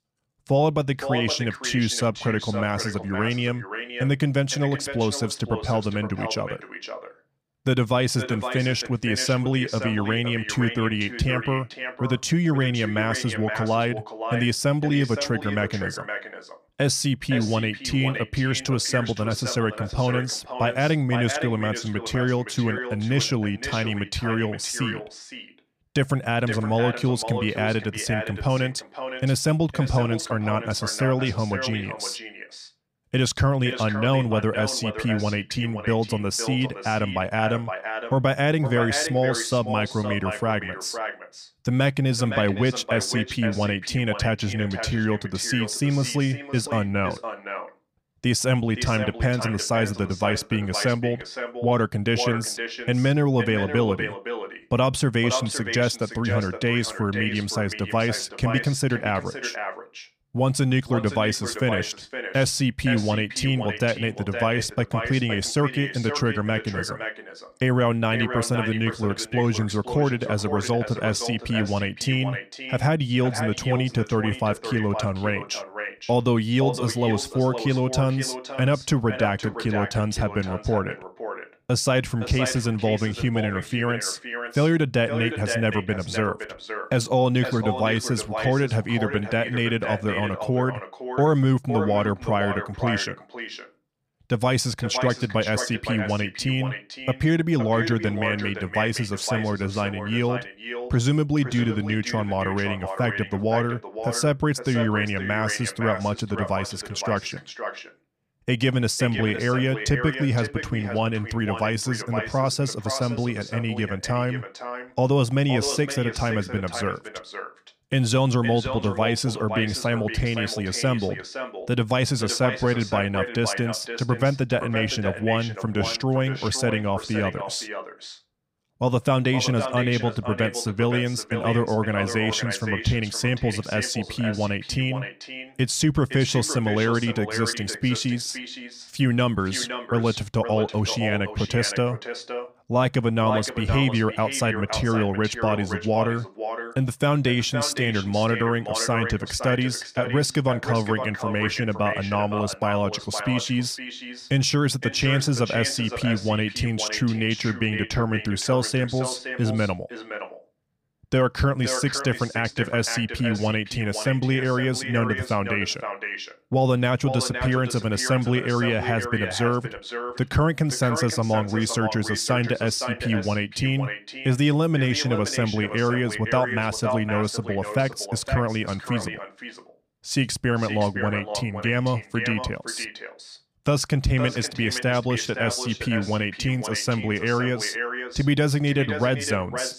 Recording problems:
echo of what is said; strong; throughout; 510 ms later, 9 dB below the speech

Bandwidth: 15.5 kHz